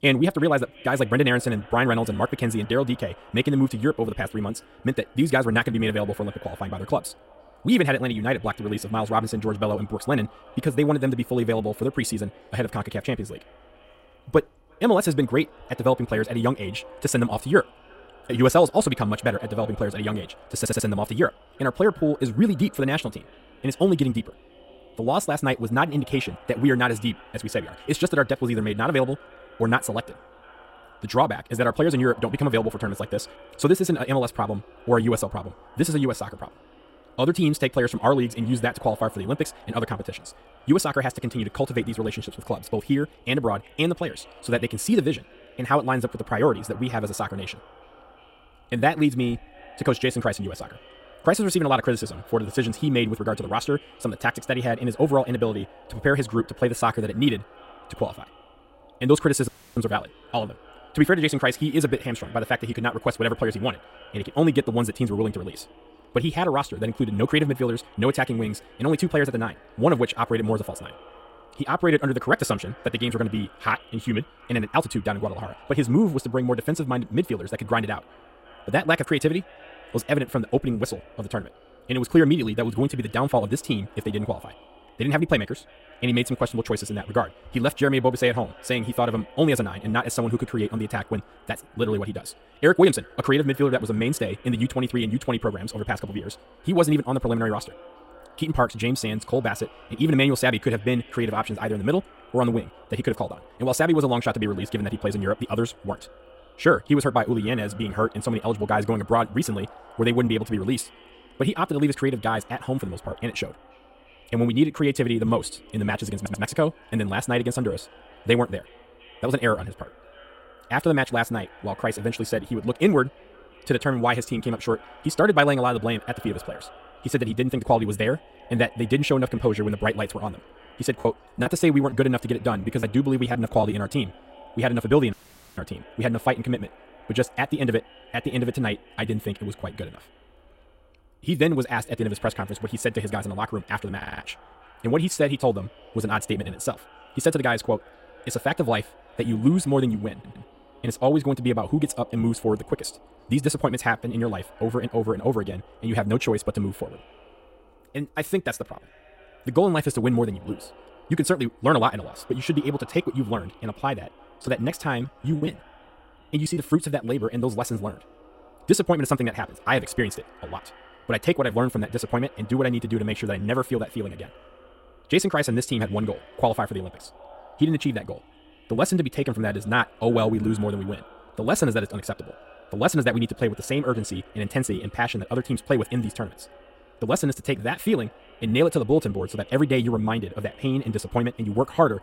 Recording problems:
wrong speed, natural pitch; too fast; 1.6 times normal speed
echo of what is said; faint; throughout; 340 ms later, 25 dB below the speech
audio stuttering; 4 times, first at 21 s
audio cutting out; at 59 s and at 2:15
choppy; very; from 2:11 to 2:14 and from 2:44 to 2:47; 10% of the speech affected

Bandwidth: 16 kHz